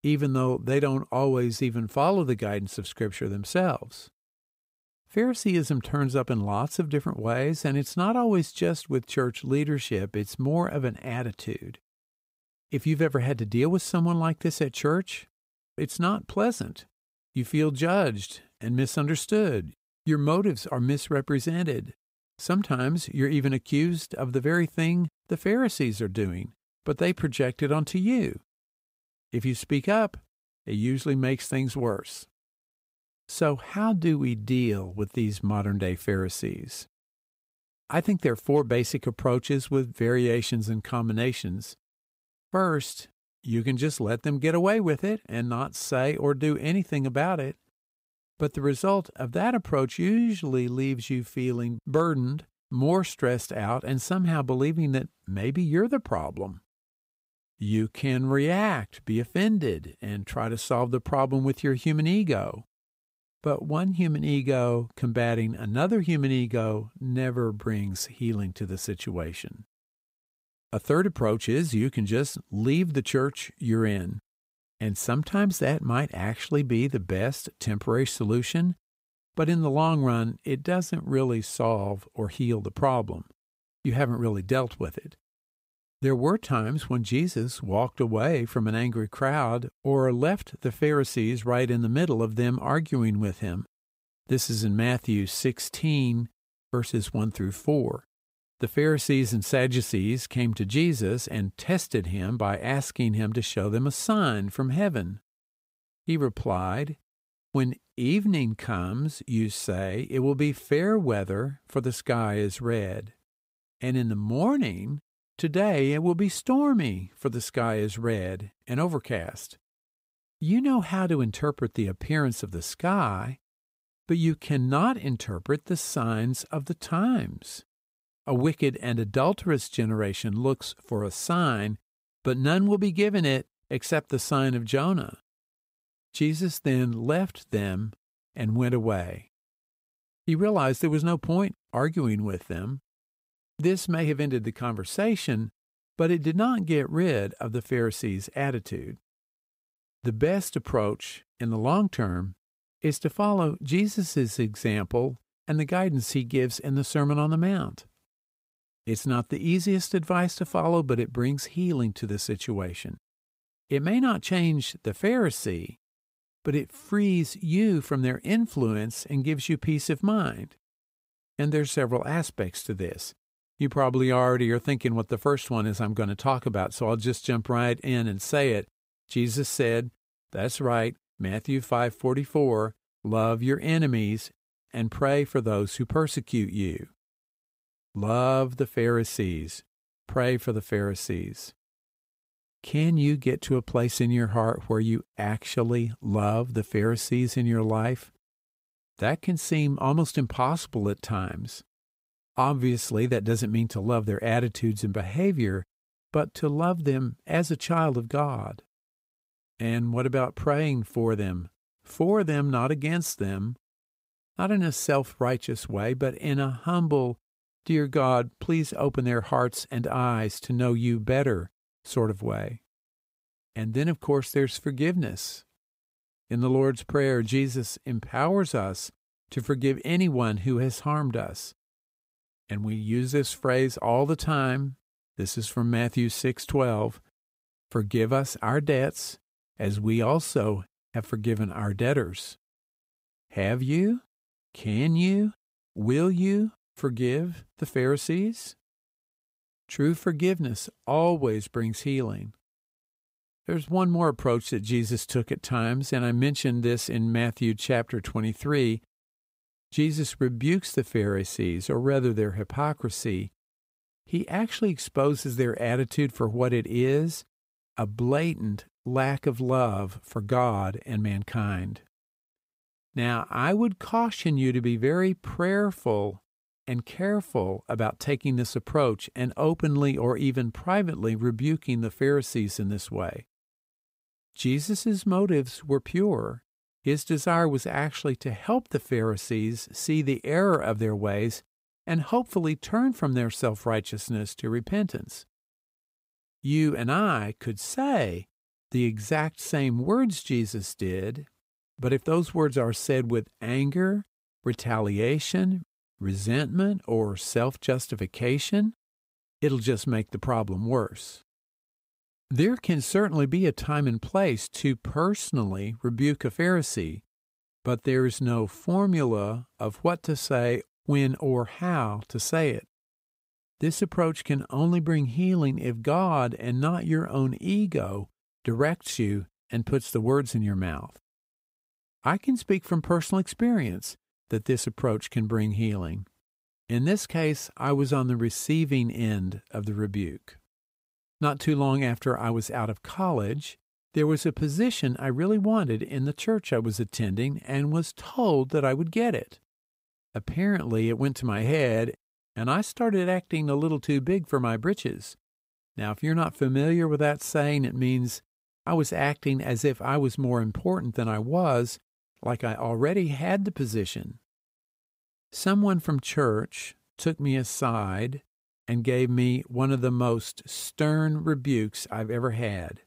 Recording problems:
none

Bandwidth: 15.5 kHz